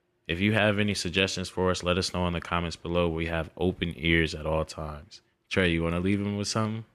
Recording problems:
none

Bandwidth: 14 kHz